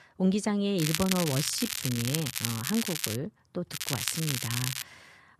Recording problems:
crackling; loud; from 1 to 3 s and from 3.5 to 5 s; 1 dB below the speech

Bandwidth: 14 kHz